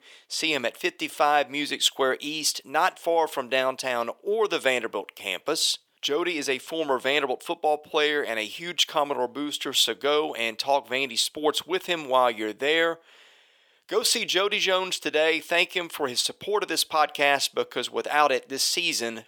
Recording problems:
thin; somewhat; fading below 500 Hz

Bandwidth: 18.5 kHz